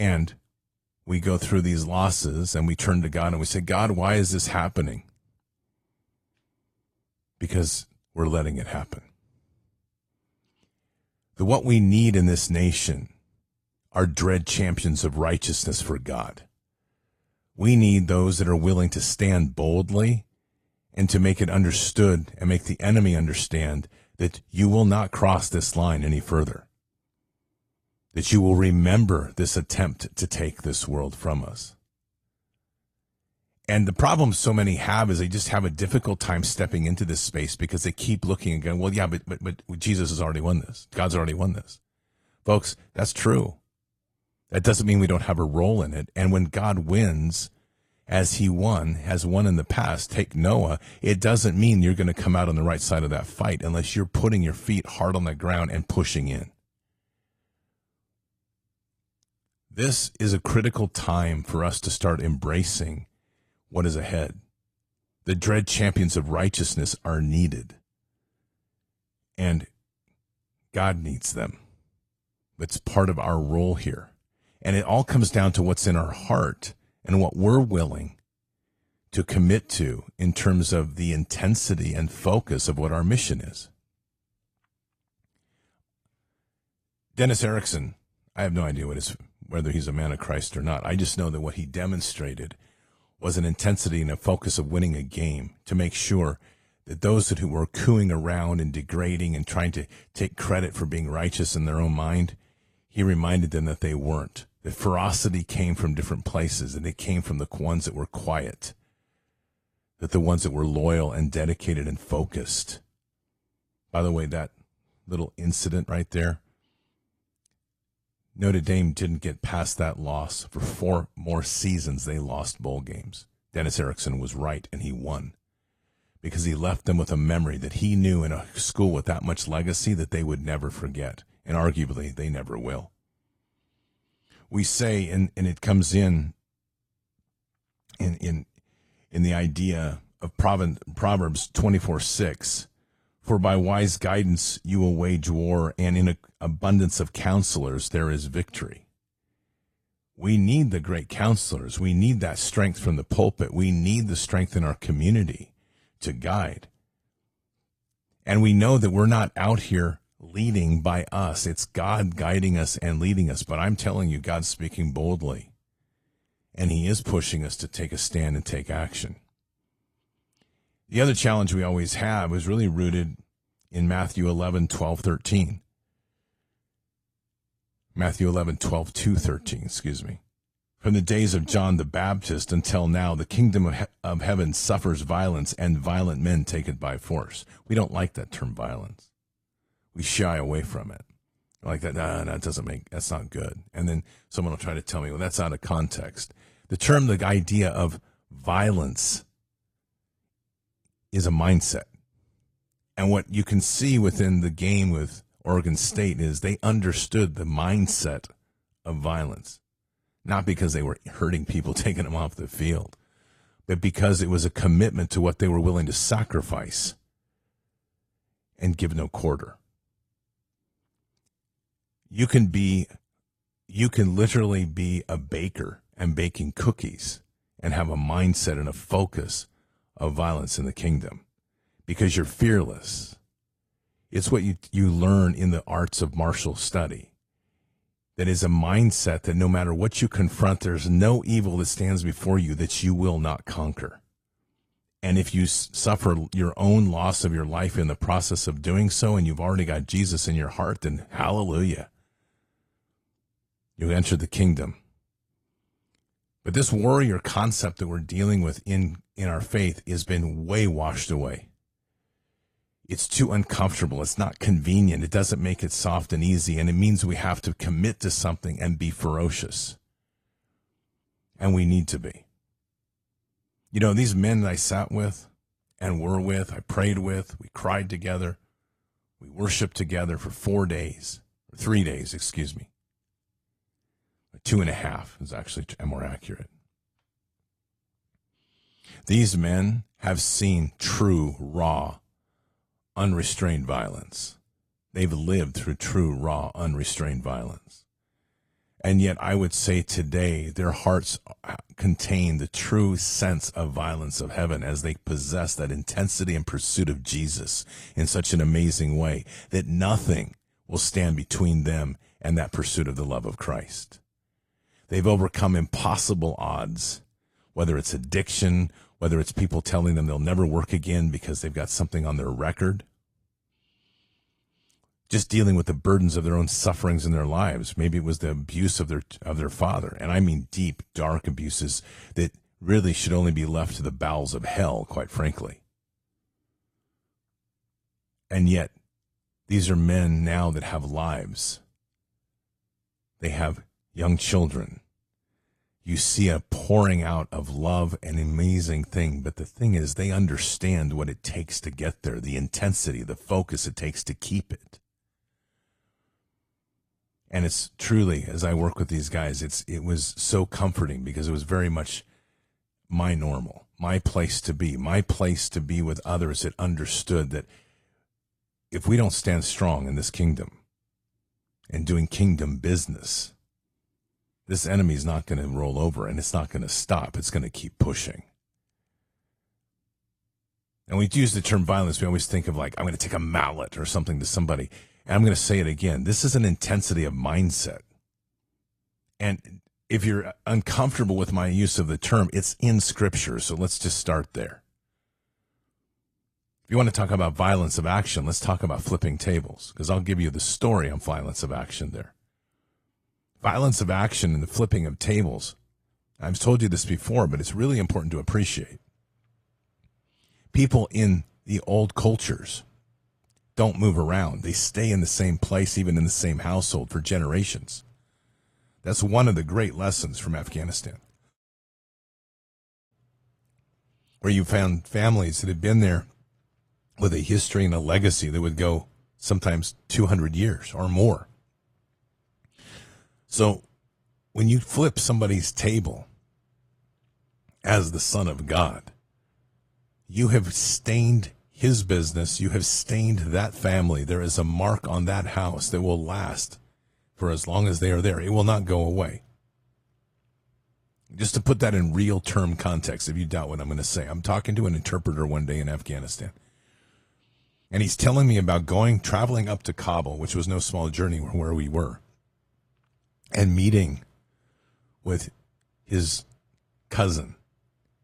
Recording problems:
garbled, watery; slightly
abrupt cut into speech; at the start

